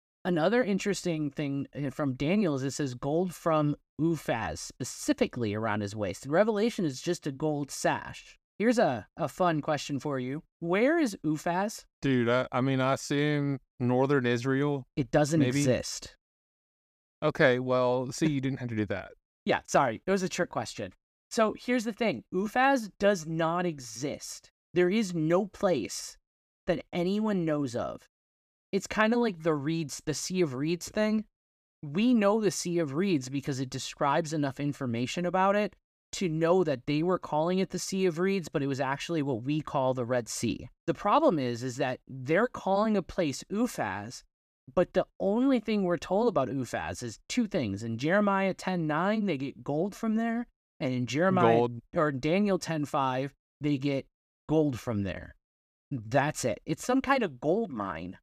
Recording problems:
none

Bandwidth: 14.5 kHz